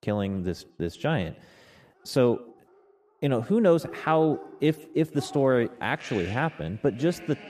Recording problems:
echo of what is said; faint; throughout; 140 ms later, 25 dB below the speech
animal sounds; noticeable; throughout; 20 dB below the speech

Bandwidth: 14.5 kHz